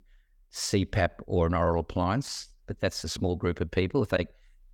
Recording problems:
none

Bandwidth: 18.5 kHz